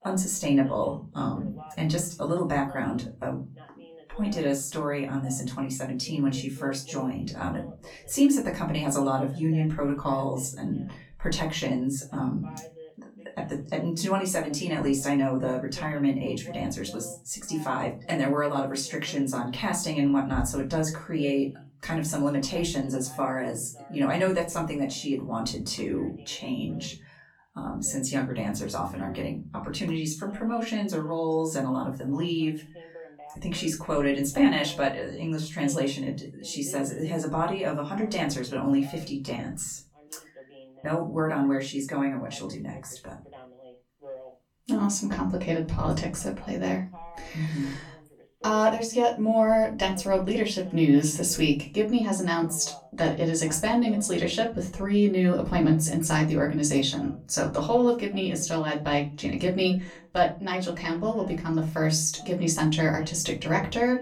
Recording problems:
off-mic speech; far
room echo; very slight; dies away in 0.4 s
voice in the background; faint; throughout; 20 dB below the speech

